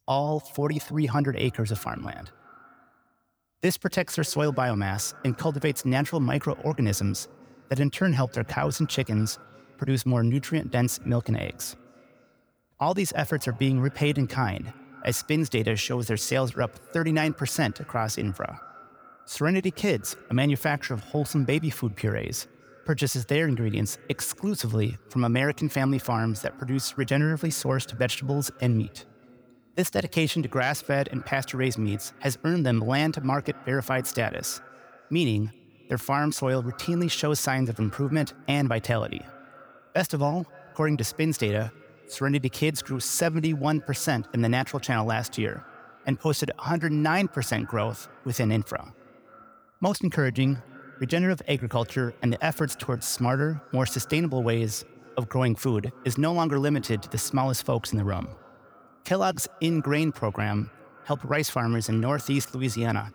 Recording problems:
echo of what is said; faint; throughout; 260 ms later, 25 dB below the speech

